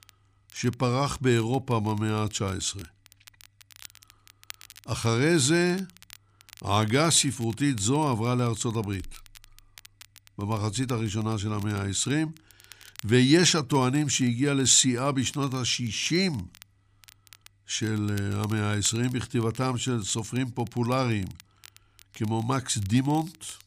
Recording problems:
crackle, like an old record; faint; 25 dB below the speech

